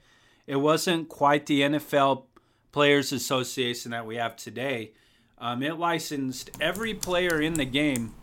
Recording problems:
household noises; noticeable; from 6.5 s on; 15 dB below the speech

